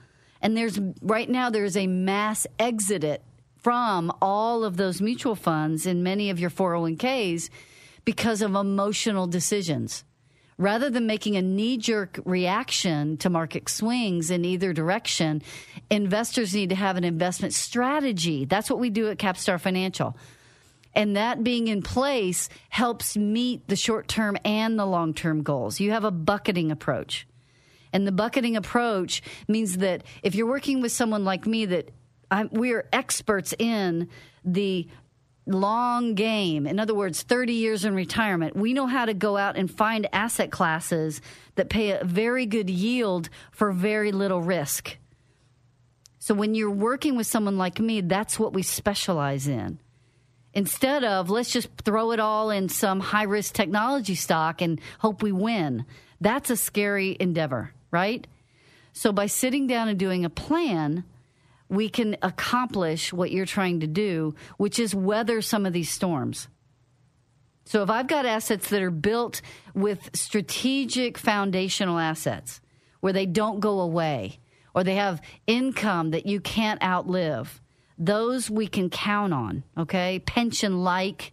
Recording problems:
squashed, flat; somewhat

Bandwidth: 14.5 kHz